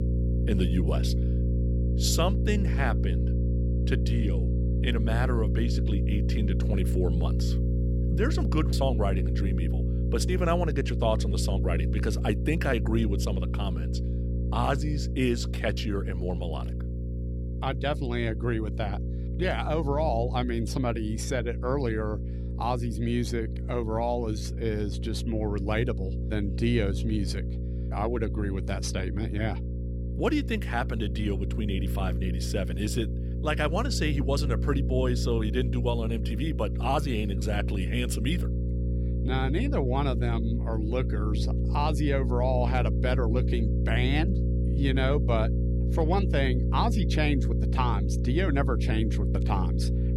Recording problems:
electrical hum; loud; throughout; 60 Hz, 9 dB below the speech

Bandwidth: 18.5 kHz